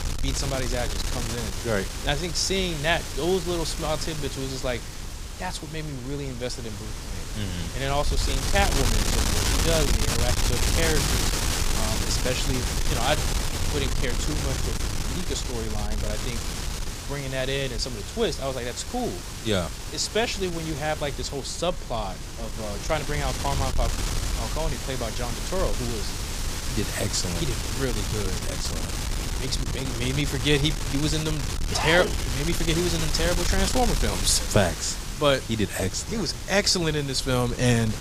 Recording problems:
wind noise on the microphone; heavy; 4 dB below the speech

